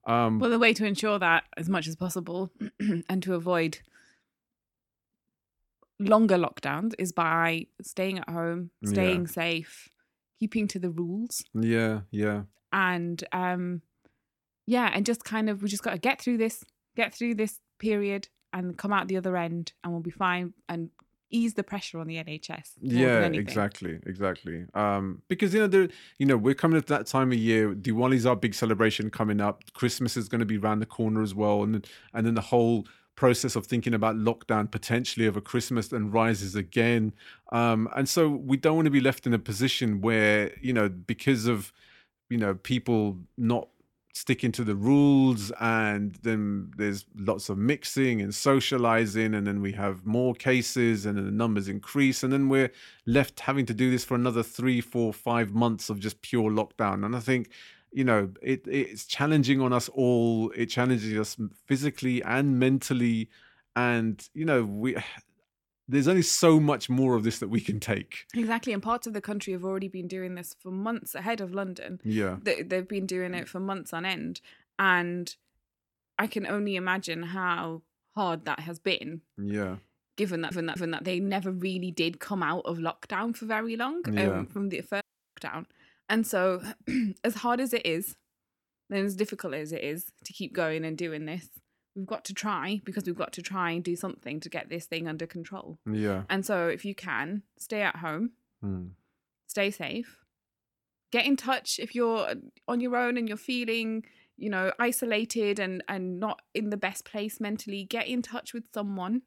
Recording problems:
audio stuttering; at 1:20
audio cutting out; at 1:25

